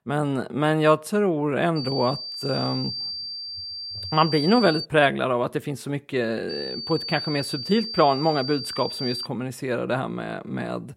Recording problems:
high-pitched whine; loud; from 2 to 5 s and from 6.5 to 9.5 s; 4.5 kHz, 6 dB below the speech

